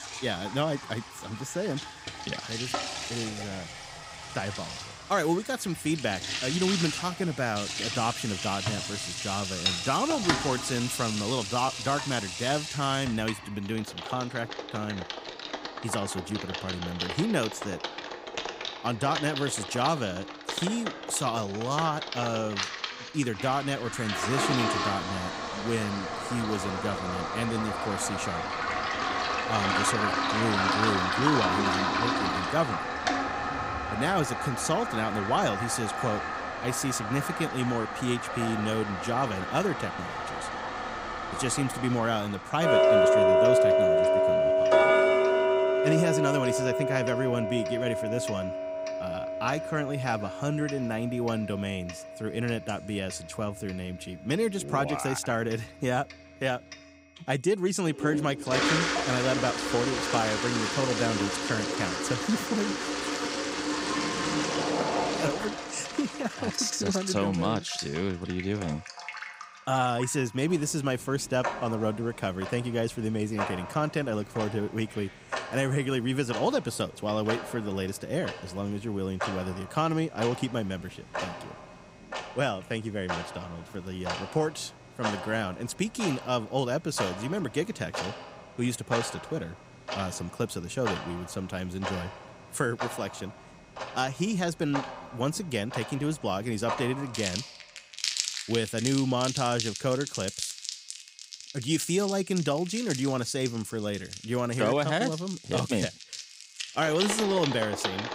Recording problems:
household noises; loud; throughout; as loud as the speech
high-pitched whine; faint; throughout; 2.5 kHz, 30 dB below the speech

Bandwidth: 15.5 kHz